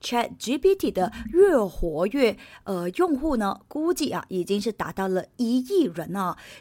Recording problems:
none

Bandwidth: 16.5 kHz